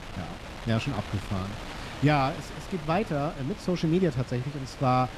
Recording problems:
wind noise on the microphone; occasional gusts; 10 dB below the speech

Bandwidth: 13.5 kHz